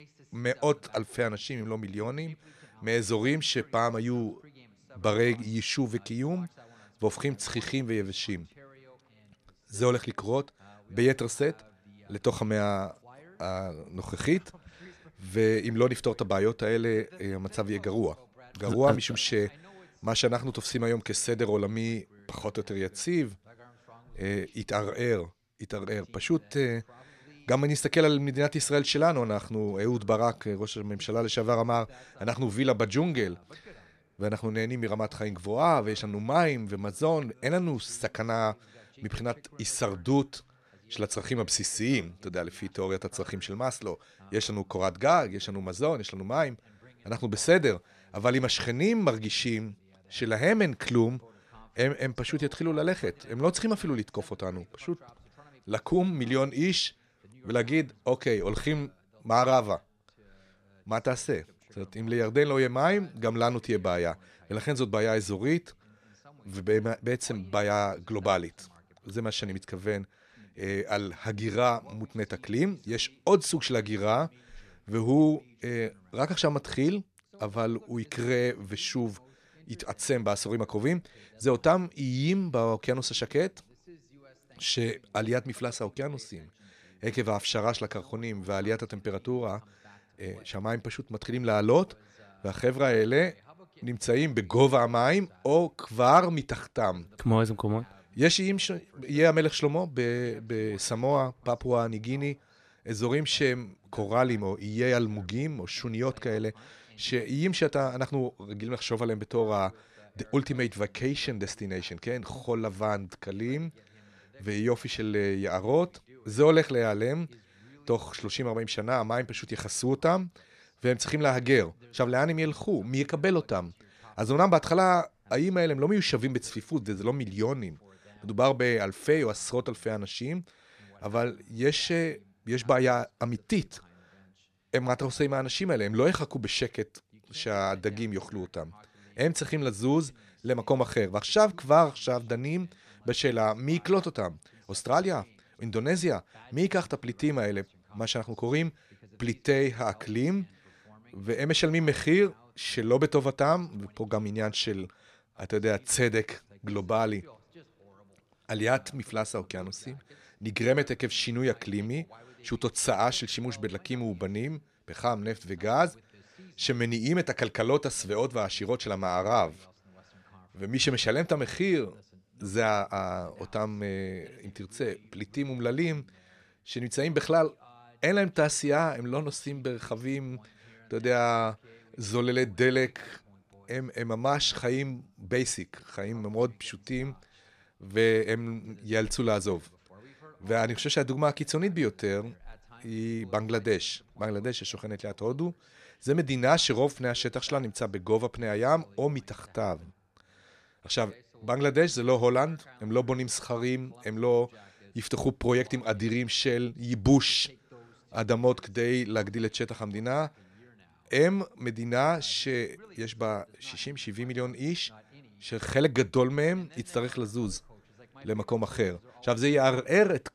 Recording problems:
voice in the background; faint; throughout; 30 dB below the speech

